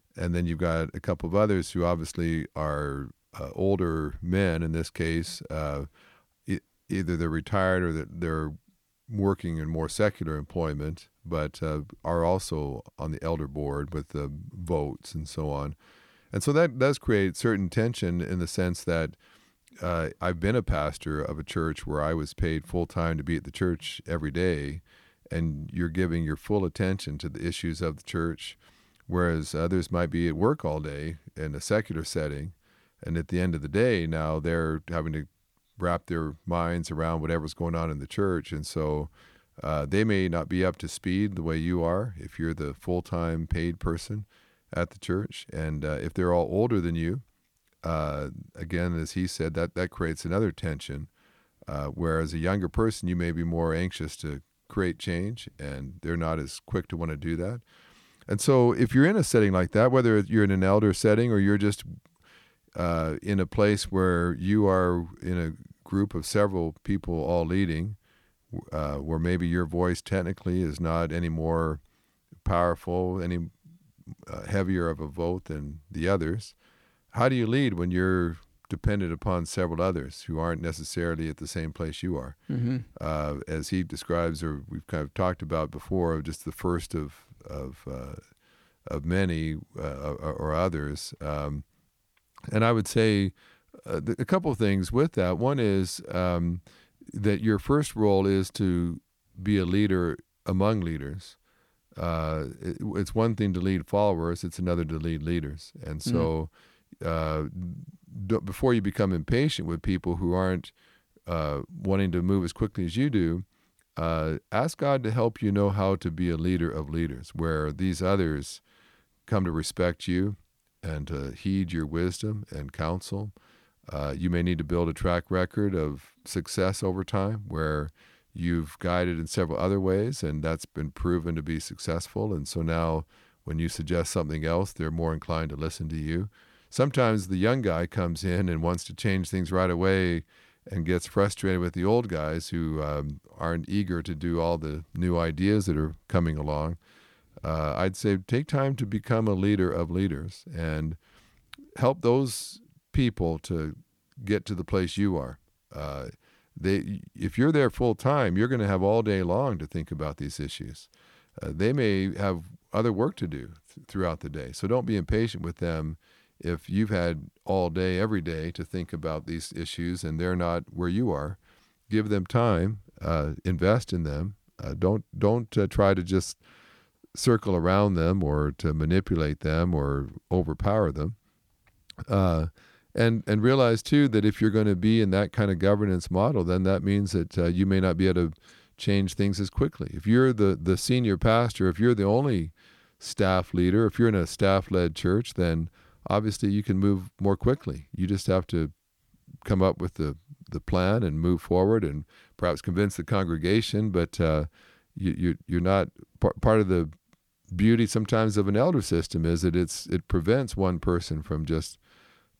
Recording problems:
none

